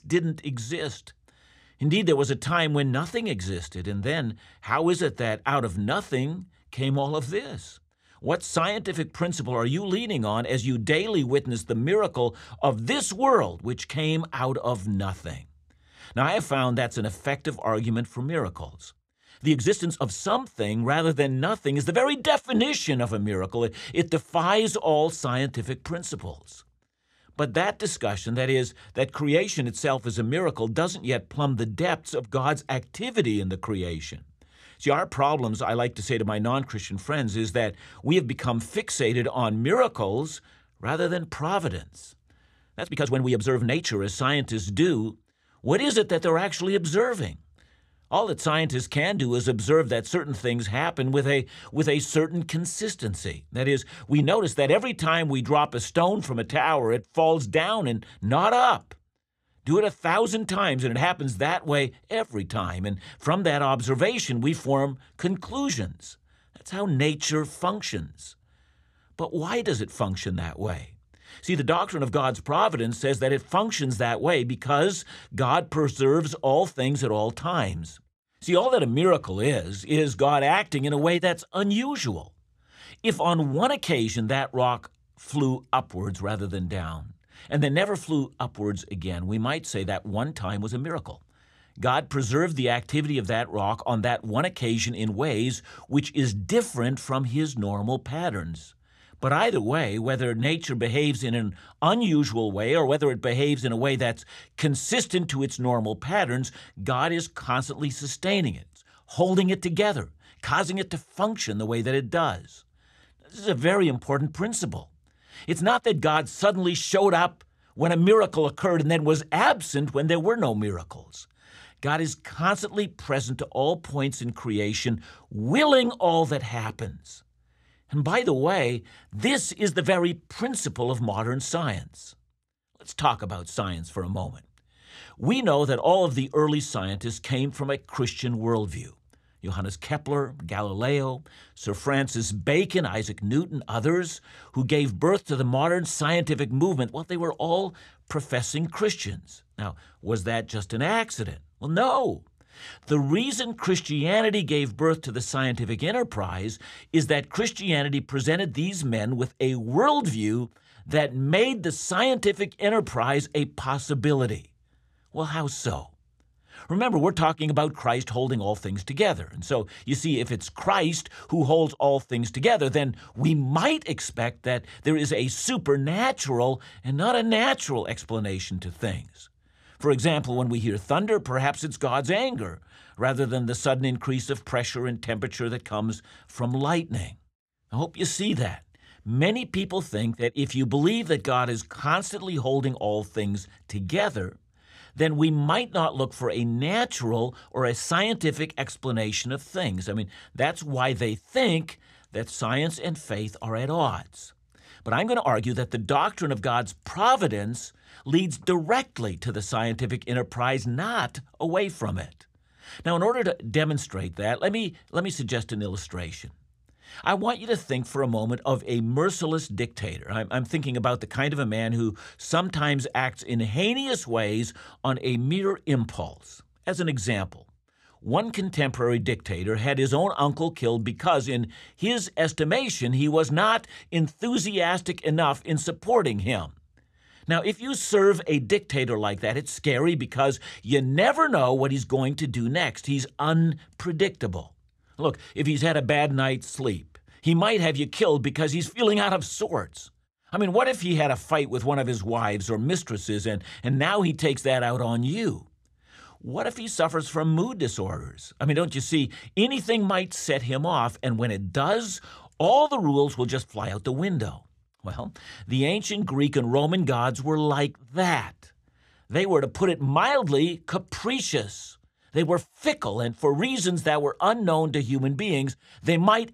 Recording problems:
uneven, jittery; strongly; from 6.5 s to 4:24

